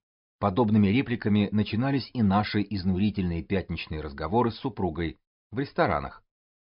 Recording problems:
high frequencies cut off; noticeable; nothing above 5.5 kHz

